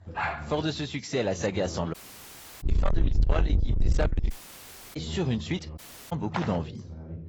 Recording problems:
distortion; heavy; 7 dB below the speech
garbled, watery; badly; nothing above 7.5 kHz
low rumble; loud; from 2.5 to 4.5 s; 6 dB below the speech
voice in the background; noticeable; throughout; 10 dB below the speech
dog barking; noticeable; at the start; peak 1 dB below the speech
audio cutting out; at 2 s for 0.5 s, at 4.5 s for 0.5 s and at 6 s
footsteps; noticeable; at 6.5 s; peak 5 dB below the speech

